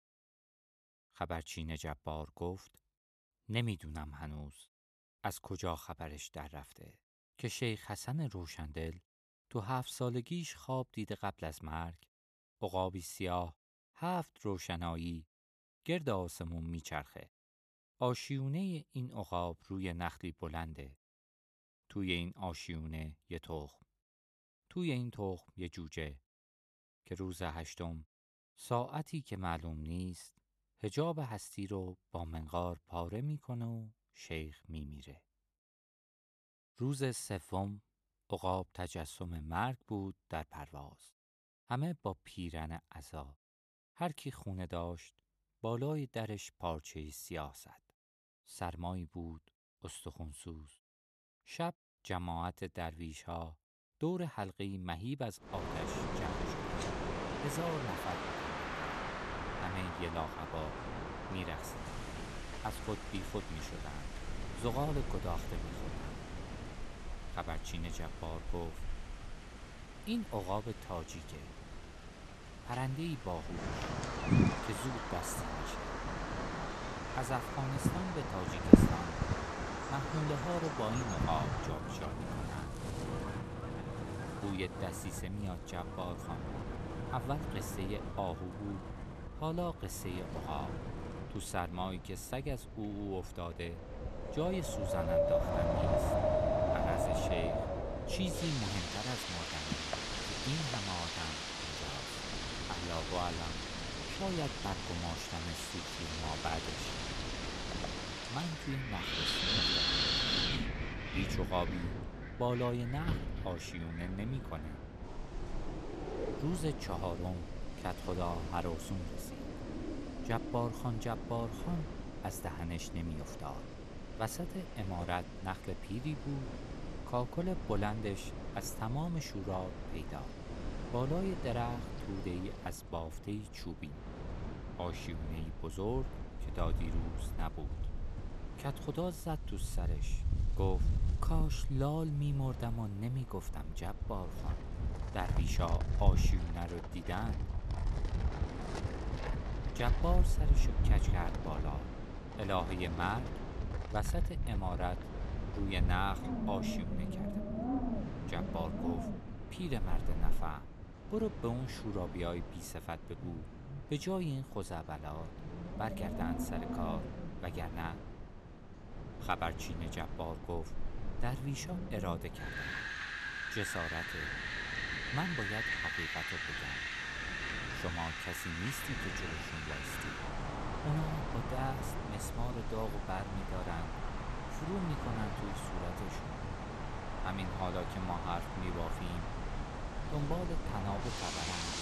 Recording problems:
wind in the background; very loud; from 56 s on; 2 dB above the speech

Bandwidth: 13.5 kHz